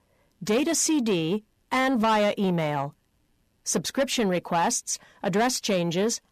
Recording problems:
distortion; slight; 10 dB below the speech

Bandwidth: 14.5 kHz